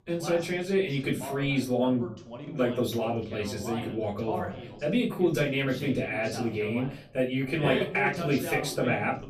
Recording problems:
off-mic speech; far
room echo; very slight; dies away in 0.3 s
voice in the background; loud; throughout; 10 dB below the speech

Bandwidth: 14.5 kHz